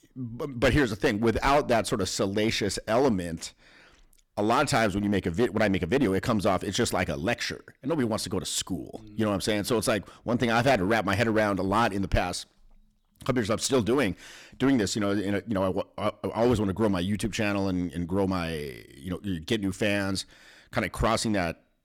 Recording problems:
distortion; slight; 6% of the sound clipped

